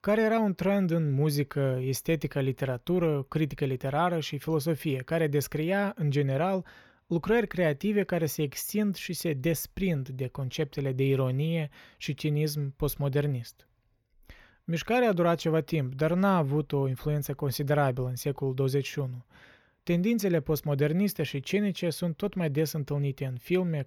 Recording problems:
none

